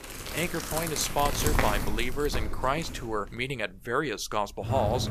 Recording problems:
household noises; loud; throughout; 2 dB below the speech

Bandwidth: 14.5 kHz